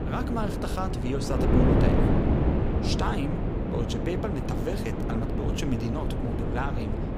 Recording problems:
wind noise on the microphone; heavy; 2 dB above the speech

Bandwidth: 15.5 kHz